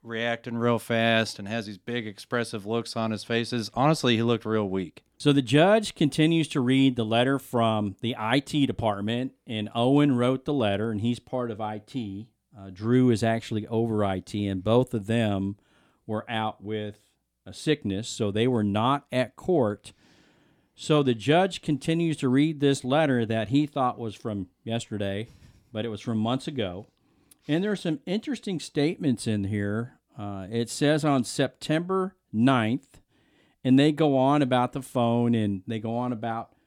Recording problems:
none

